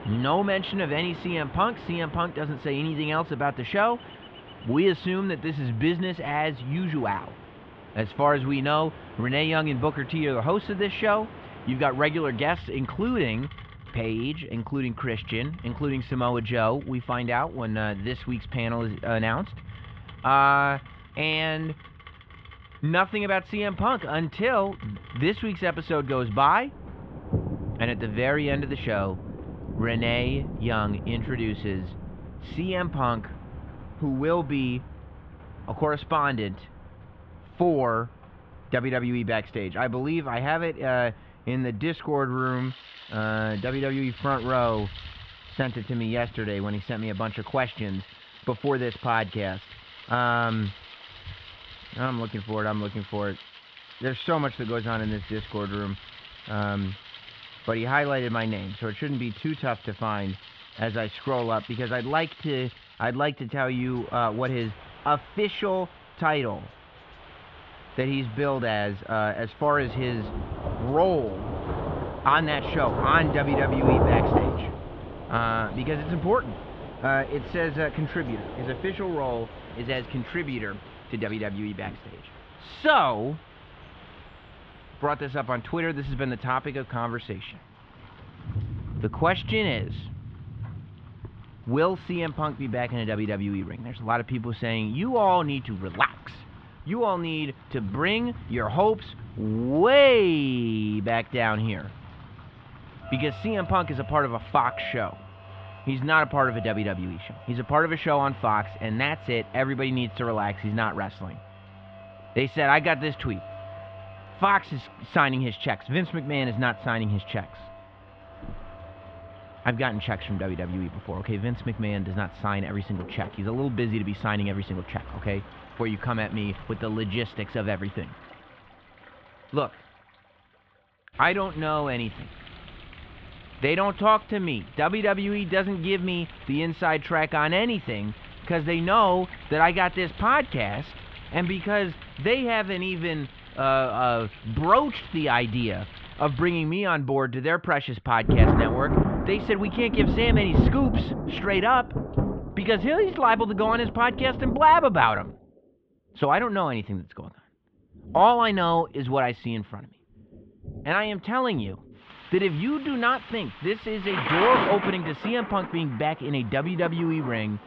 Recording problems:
muffled; very; fading above 3.5 kHz
rain or running water; loud; throughout; 10 dB below the speech

